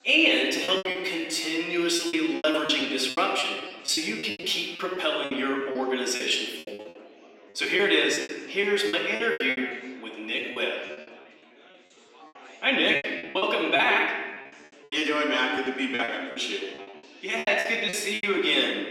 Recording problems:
off-mic speech; far
room echo; noticeable; dies away in 1.3 s
thin; somewhat; fading below 300 Hz
chatter from many people; faint; throughout; 25 dB below the speech
choppy; very; 15% of the speech affected

